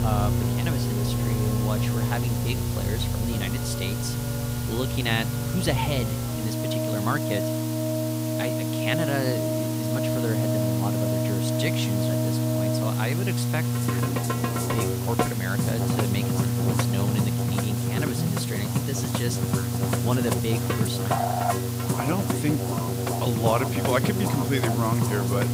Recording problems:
background music; very loud; throughout; as loud as the speech
electrical hum; loud; throughout; 60 Hz, 5 dB below the speech
hiss; loud; throughout; 6 dB below the speech

